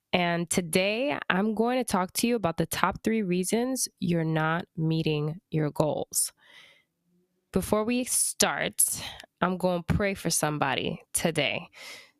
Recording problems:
squashed, flat; somewhat

